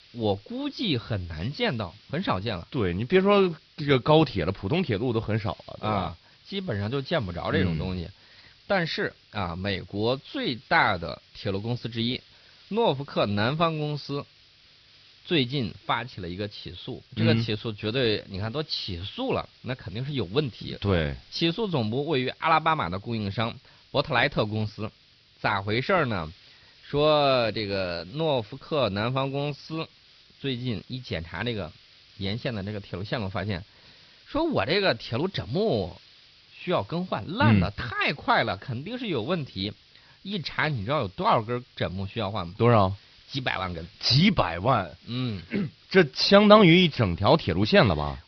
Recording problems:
high frequencies cut off; noticeable; nothing above 5.5 kHz
hiss; faint; throughout; 25 dB below the speech

